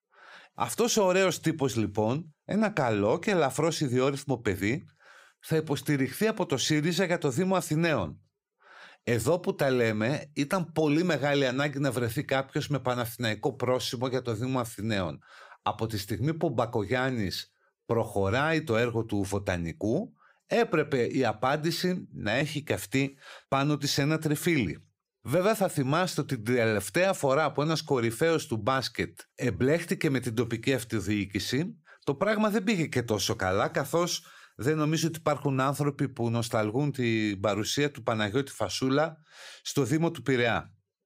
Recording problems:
none

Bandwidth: 15.5 kHz